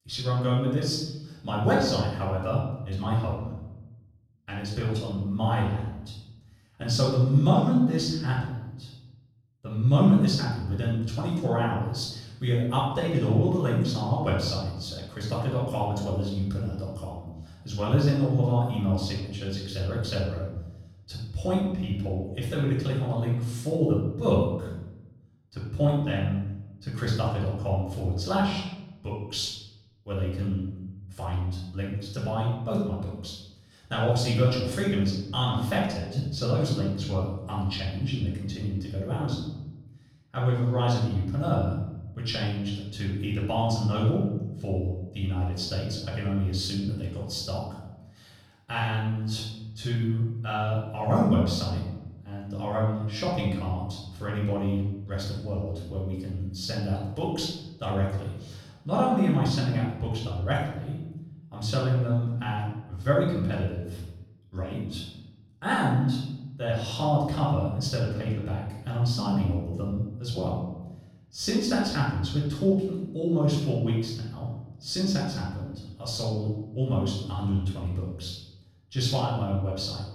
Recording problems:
off-mic speech; far
room echo; noticeable; dies away in 0.9 s

